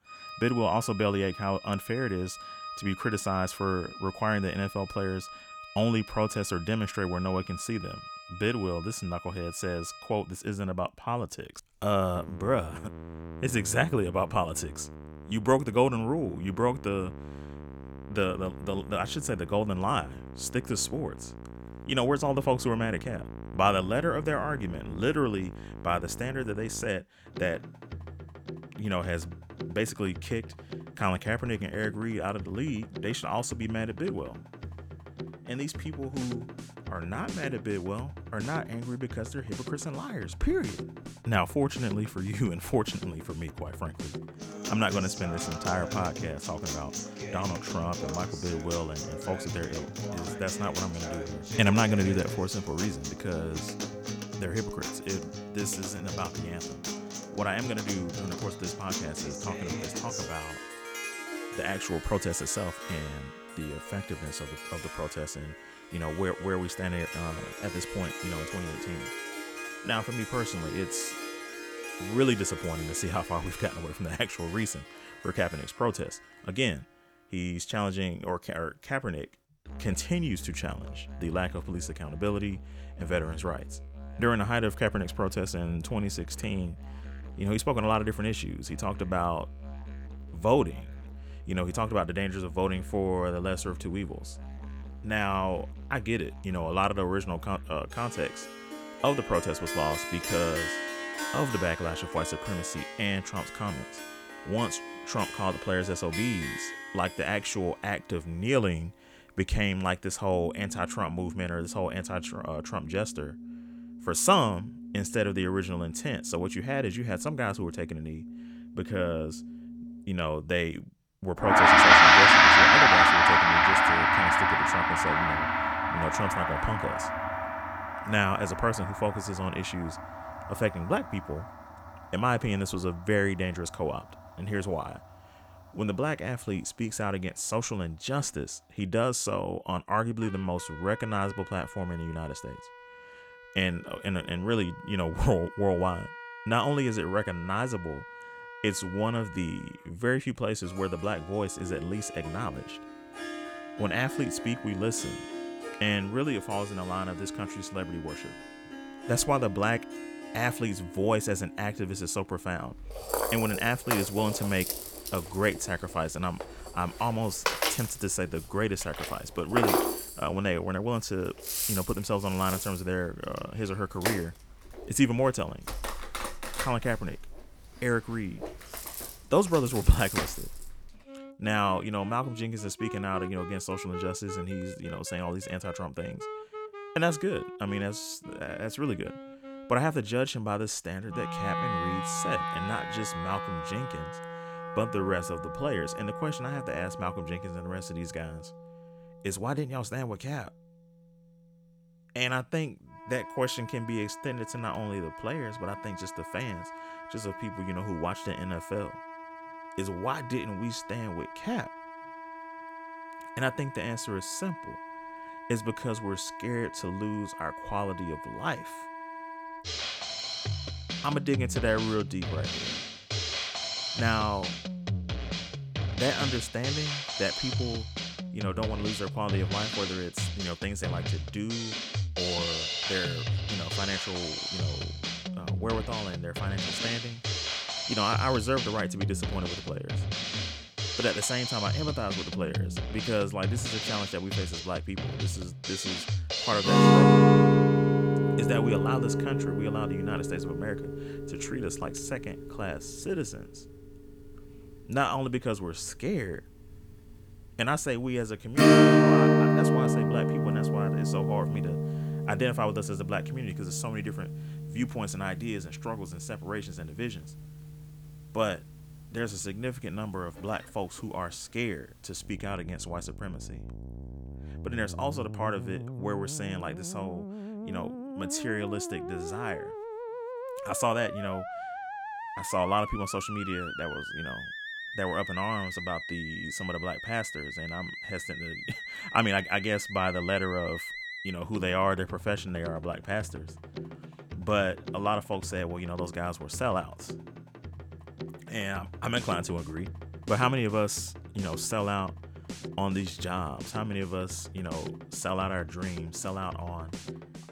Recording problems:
background music; very loud; throughout; 2 dB above the speech

